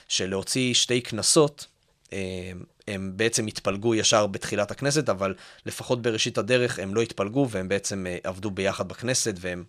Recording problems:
none

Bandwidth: 14 kHz